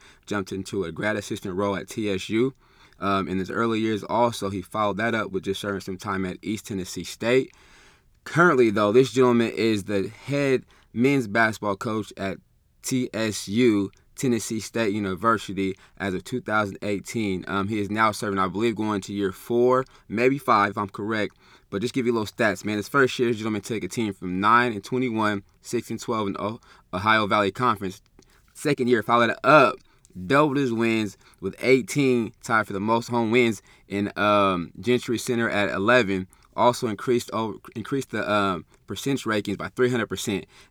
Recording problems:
uneven, jittery; strongly; from 2.5 to 35 s

